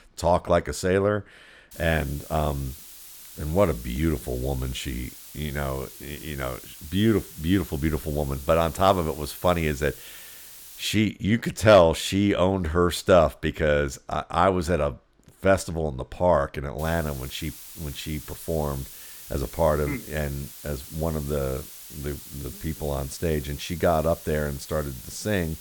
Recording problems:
hiss; noticeable; from 1.5 to 11 s and from 17 s on; 15 dB below the speech

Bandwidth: 18.5 kHz